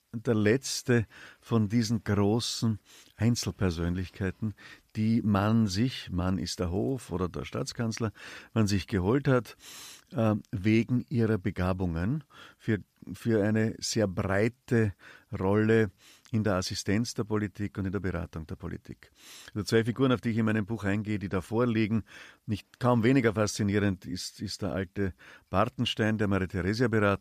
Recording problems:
none

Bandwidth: 14.5 kHz